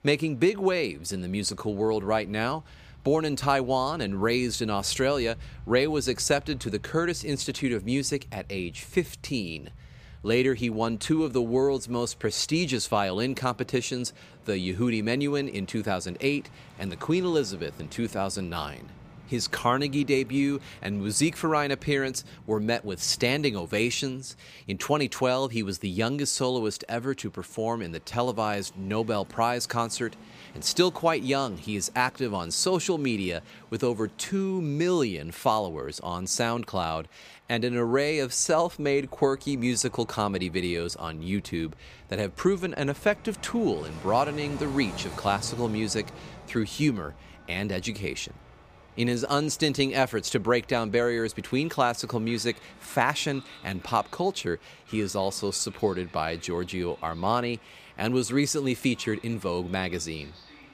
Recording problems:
train or aircraft noise; faint; throughout; 20 dB below the speech

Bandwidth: 15 kHz